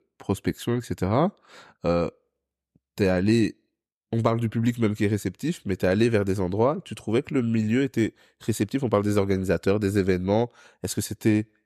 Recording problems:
none

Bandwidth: 13.5 kHz